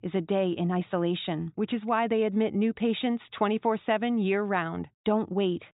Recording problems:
high frequencies cut off; severe; nothing above 4 kHz

